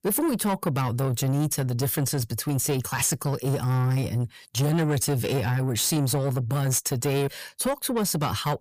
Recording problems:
distortion; slight; 9 dB below the speech

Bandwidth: 15 kHz